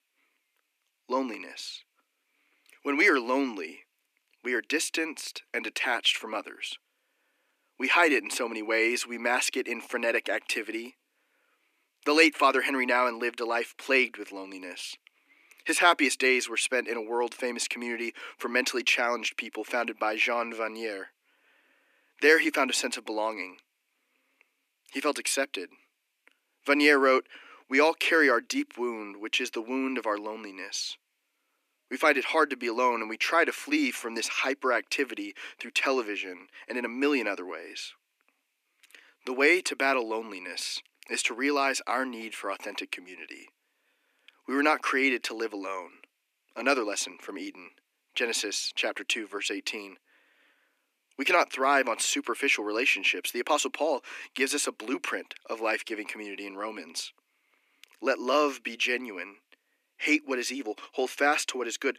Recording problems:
thin; somewhat; fading below 300 Hz

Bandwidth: 14.5 kHz